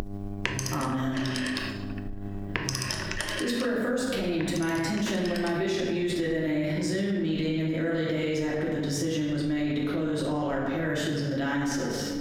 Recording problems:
off-mic speech; far
room echo; noticeable; dies away in 1.1 s
squashed, flat; somewhat
electrical hum; noticeable; throughout; 50 Hz, 20 dB below the speech
phone ringing; noticeable; until 5.5 s; peak 1 dB below the speech

